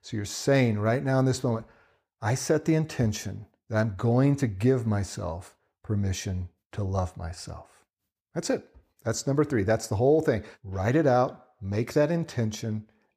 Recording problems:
none

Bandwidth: 15 kHz